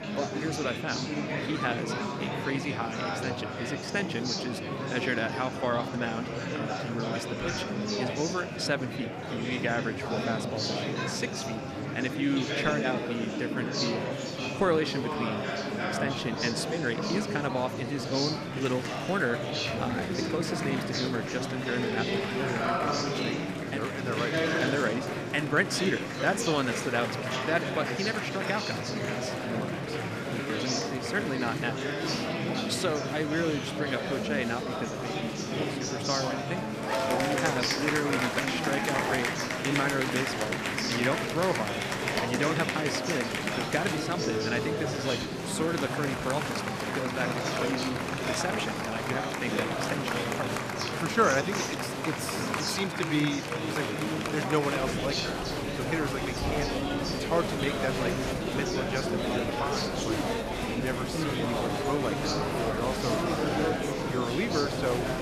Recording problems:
murmuring crowd; very loud; throughout; 2 dB above the speech

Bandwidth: 14 kHz